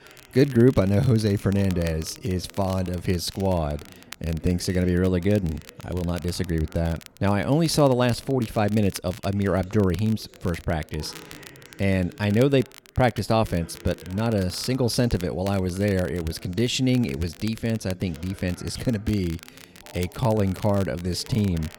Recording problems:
background chatter; faint; throughout; 4 voices, 25 dB below the speech
crackle, like an old record; faint; 20 dB below the speech

